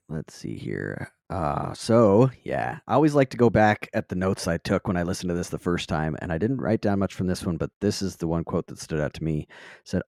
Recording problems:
muffled; slightly; fading above 3 kHz

